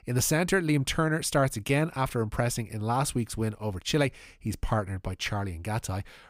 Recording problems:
none

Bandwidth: 15.5 kHz